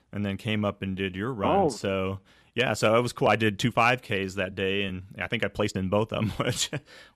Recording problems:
uneven, jittery; strongly; from 1 to 6.5 s

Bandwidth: 14.5 kHz